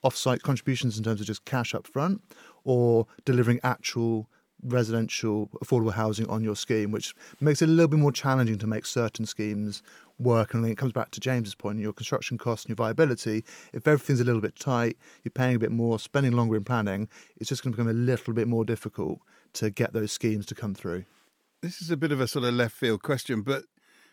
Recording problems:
none

